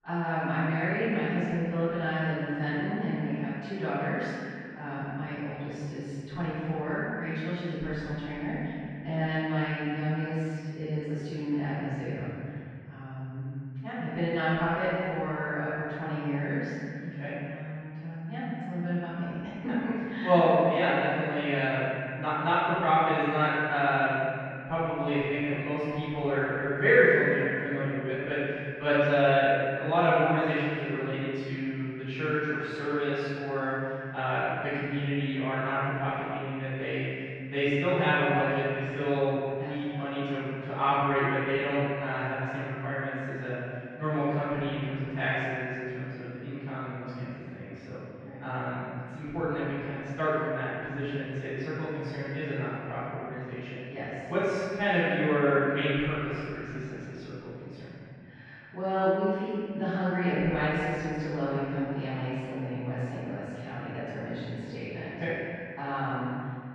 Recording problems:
room echo; strong; dies away in 2.7 s
off-mic speech; far
muffled; very; fading above 2 kHz

